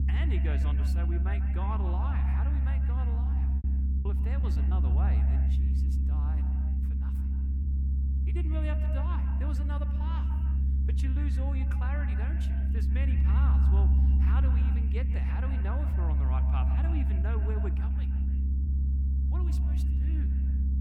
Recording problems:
echo of what is said; strong; throughout; 140 ms later, 9 dB below the speech
low rumble; loud; throughout; 1 dB below the speech
choppy; very; at 4 s; 11% of the speech affected

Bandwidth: 17.5 kHz